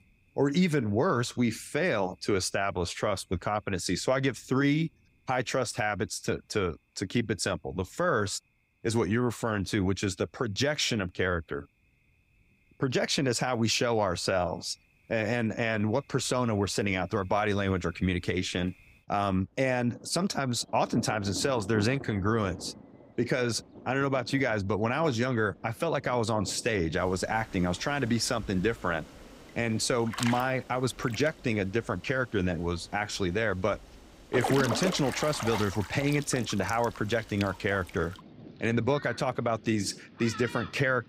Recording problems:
rain or running water; noticeable; throughout; 10 dB below the speech

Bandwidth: 15.5 kHz